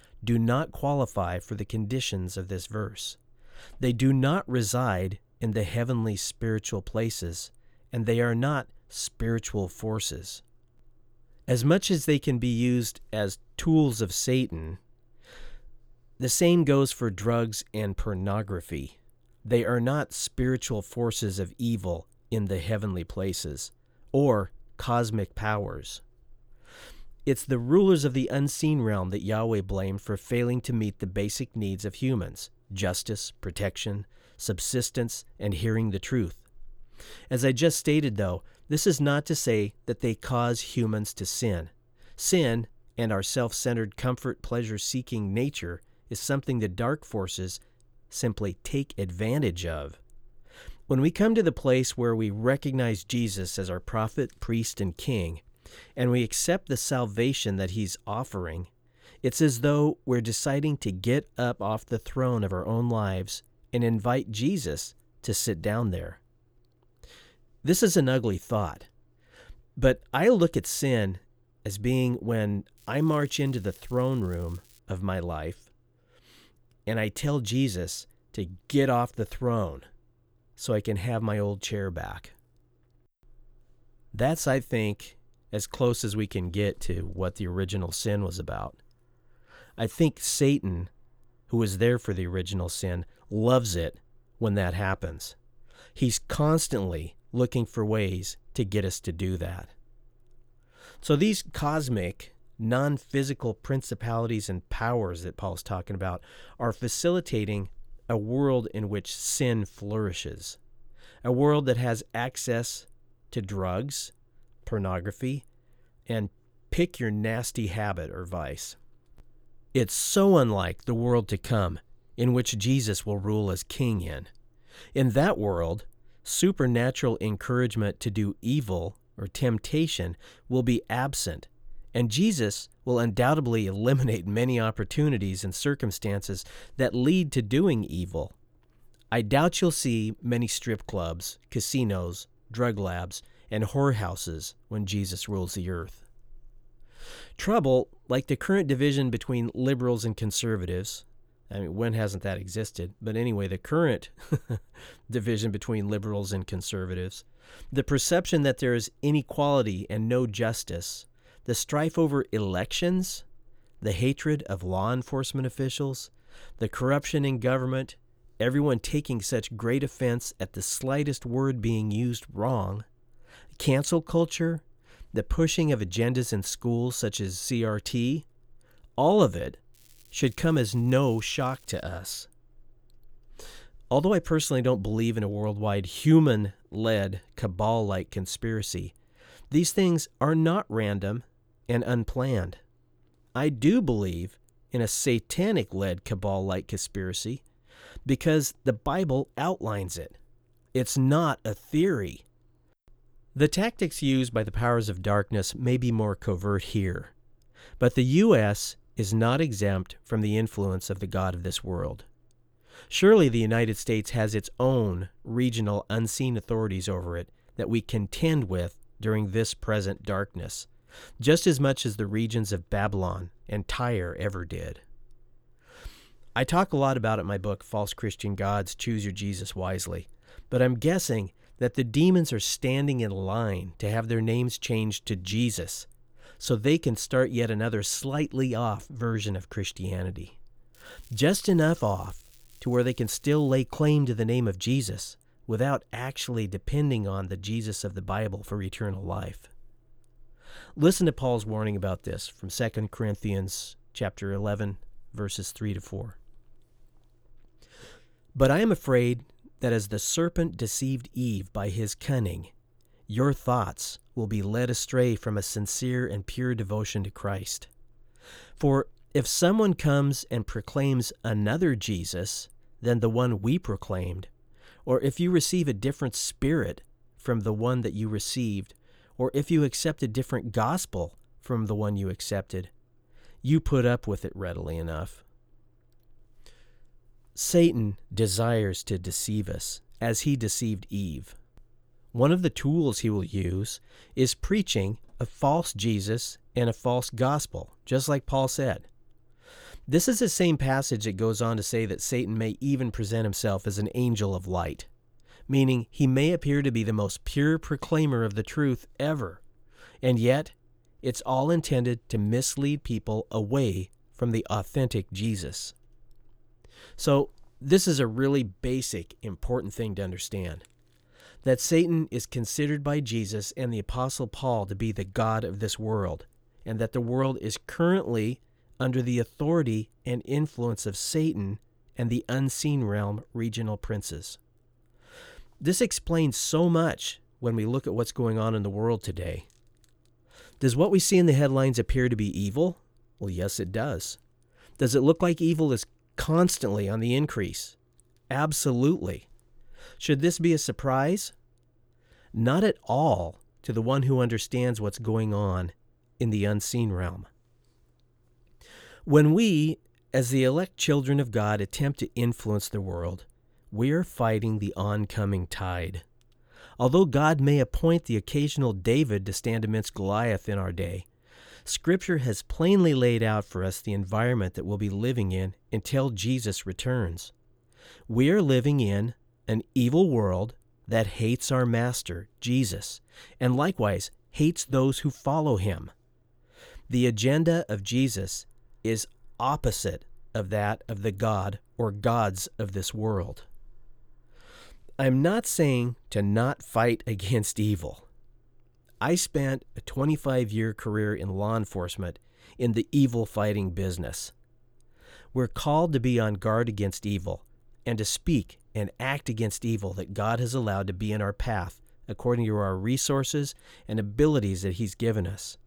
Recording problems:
crackling; faint; from 1:13 to 1:15, from 3:00 to 3:02 and from 4:01 to 4:04; 30 dB below the speech

